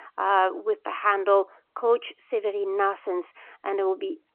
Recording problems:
phone-call audio

